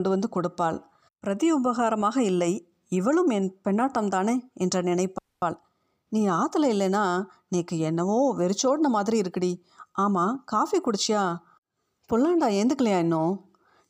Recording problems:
abrupt cut into speech; at the start
audio freezing; at 5 s

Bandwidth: 15 kHz